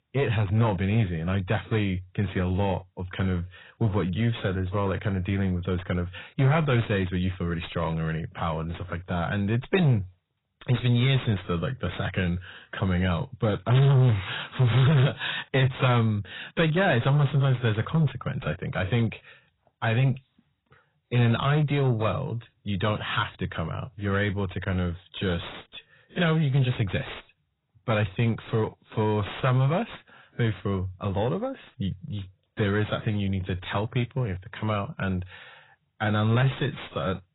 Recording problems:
distortion; heavy; 7 dB below the speech
garbled, watery; badly; nothing above 4 kHz

